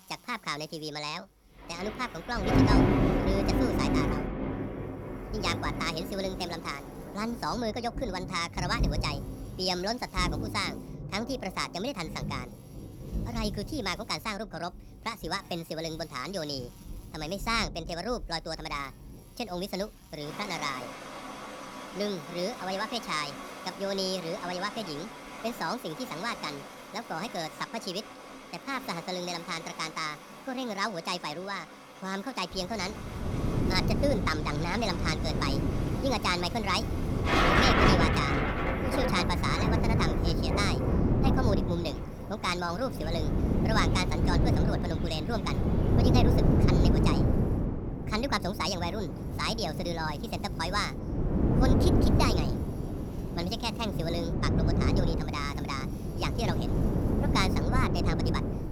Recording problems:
wrong speed and pitch; too fast and too high; 1.5 times normal speed
wind noise on the microphone; heavy; from 33 s on; 3 dB below the speech
rain or running water; loud; throughout; 2 dB below the speech
electrical hum; faint; throughout; 60 Hz, 25 dB below the speech

